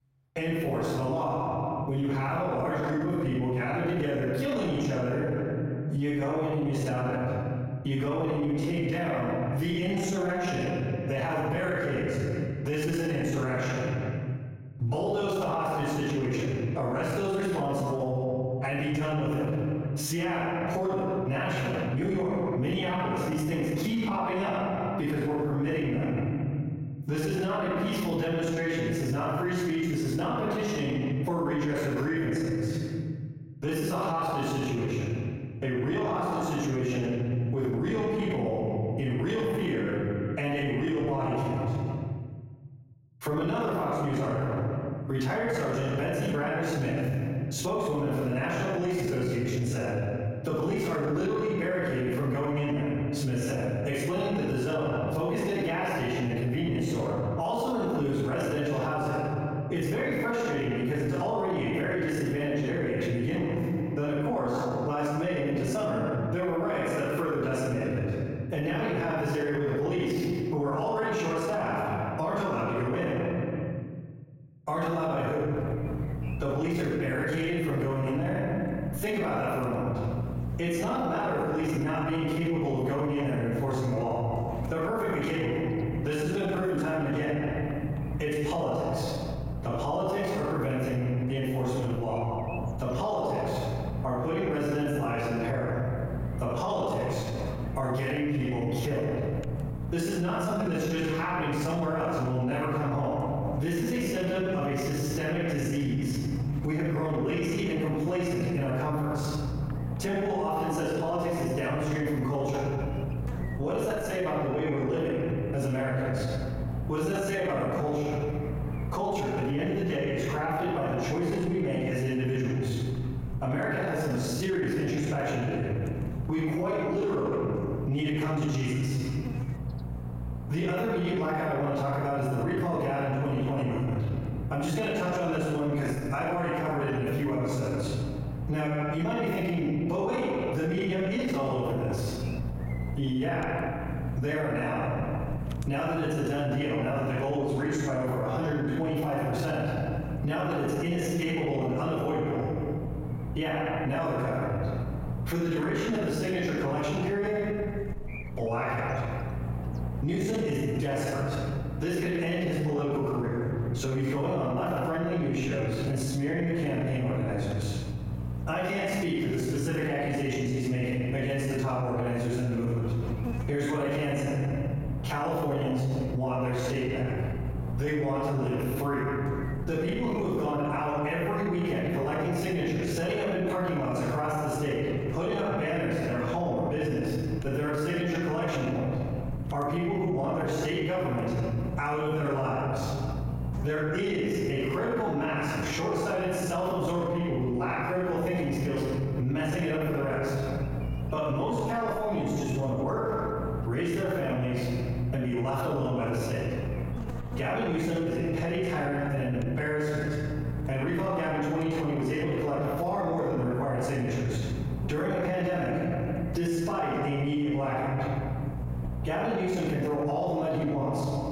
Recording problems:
room echo; strong; dies away in 1.3 s
off-mic speech; far
squashed, flat; somewhat
electrical hum; noticeable; from 1:16 on; 60 Hz, 20 dB below the speech

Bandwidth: 16 kHz